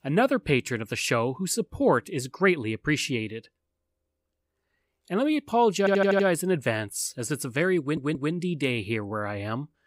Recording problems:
audio stuttering; at 6 s and at 8 s

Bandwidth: 15.5 kHz